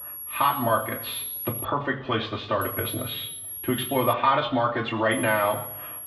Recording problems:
off-mic speech; far
muffled; very; fading above 3.5 kHz
room echo; slight; dies away in 0.8 s
high-pitched whine; loud; until 1.5 s, from 2.5 to 4 s and at 5 s; 11.5 kHz, 7 dB below the speech

